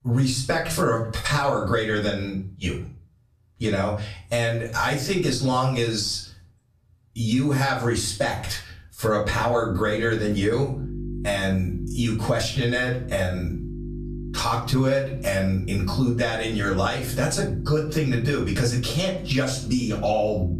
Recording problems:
off-mic speech; far
room echo; slight; dies away in 0.3 s
squashed, flat; somewhat
electrical hum; noticeable; from 9.5 s on; 50 Hz, 20 dB below the speech

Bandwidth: 14.5 kHz